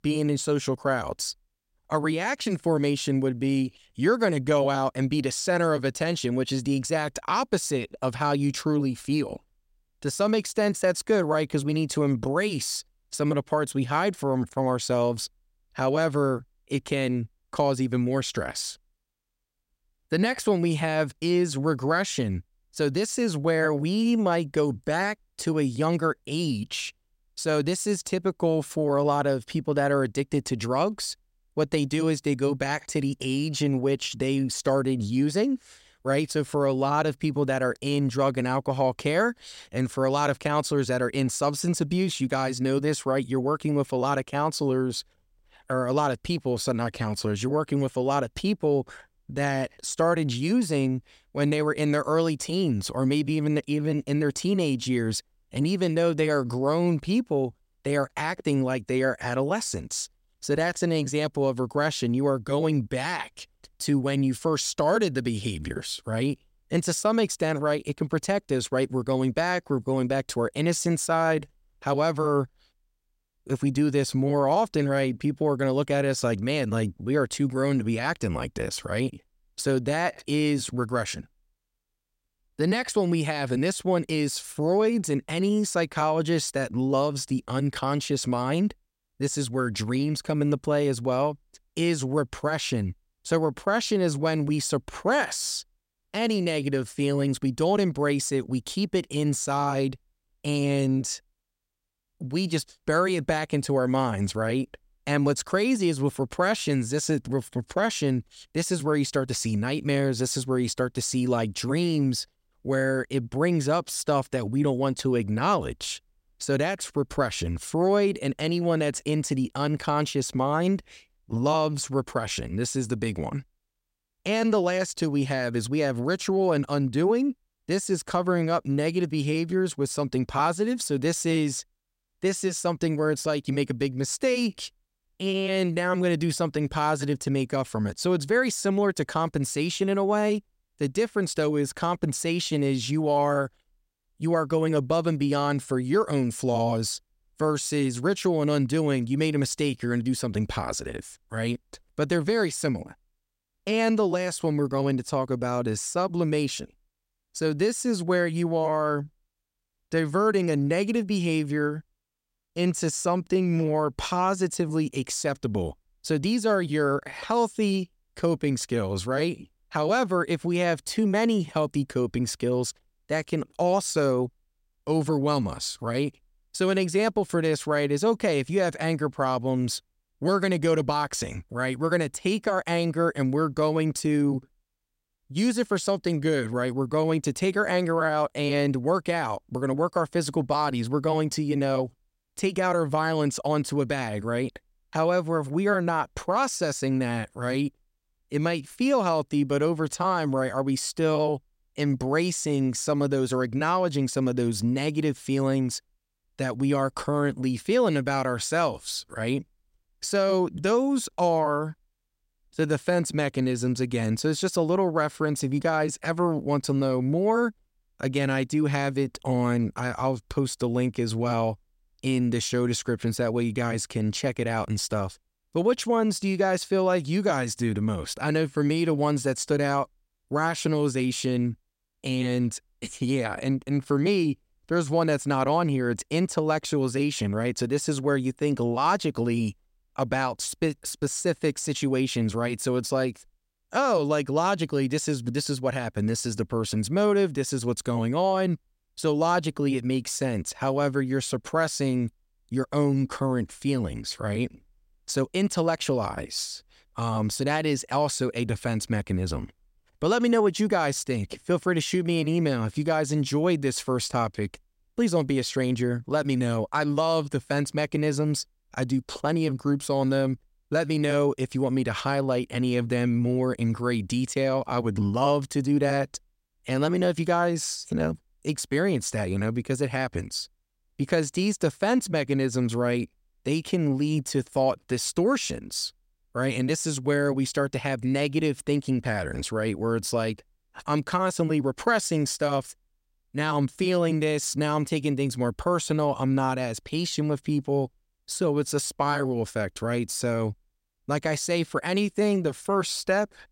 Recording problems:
none

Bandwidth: 16 kHz